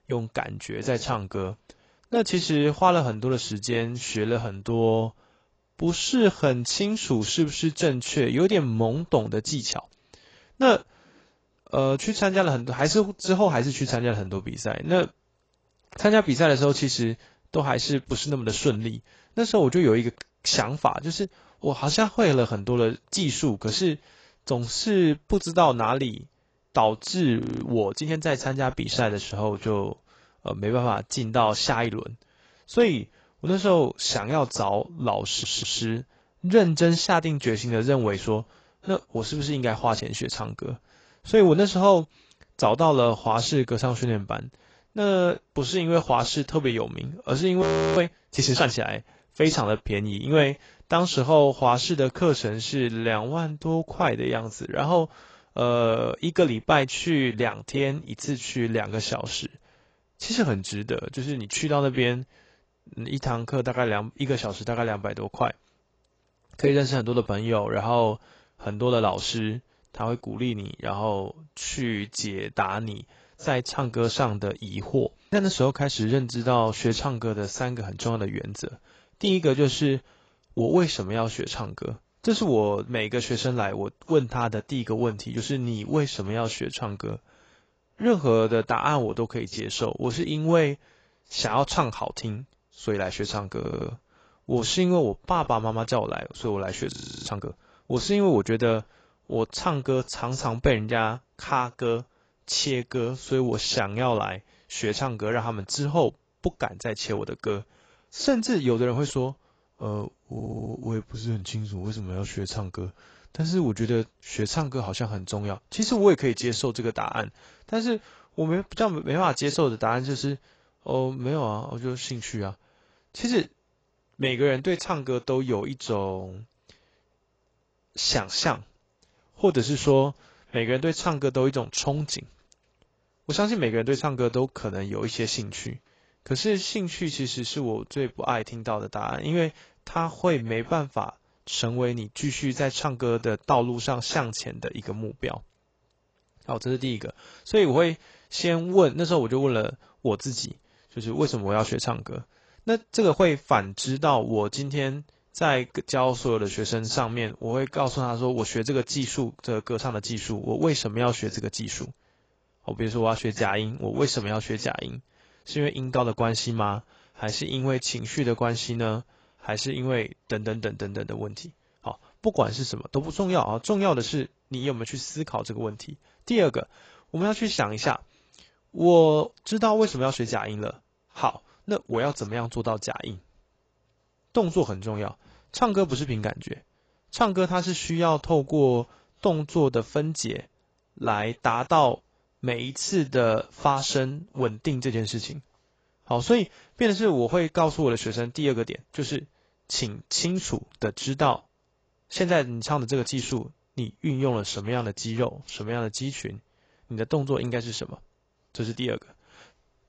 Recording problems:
garbled, watery; badly; nothing above 7.5 kHz
audio freezing; at 27 s, at 48 s and at 1:37
audio stuttering; at 35 s, at 1:34 and at 1:50

